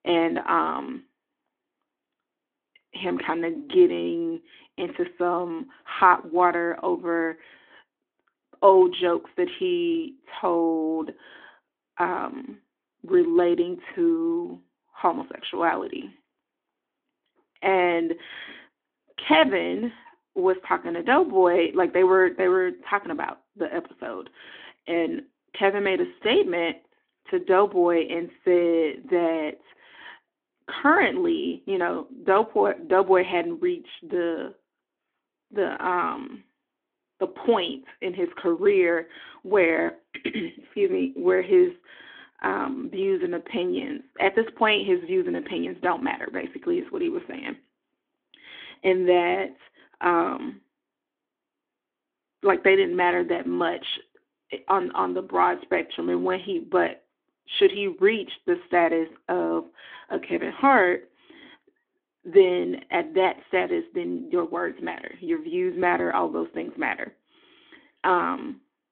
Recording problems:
phone-call audio; nothing above 3.5 kHz

